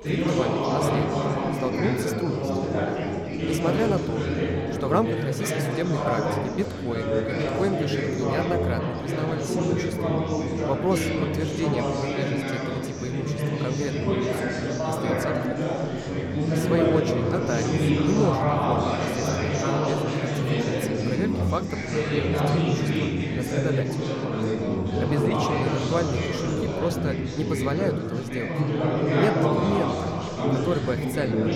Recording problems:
echo of what is said; noticeable; throughout; 480 ms later, 15 dB below the speech
chatter from many people; very loud; throughout; 5 dB above the speech

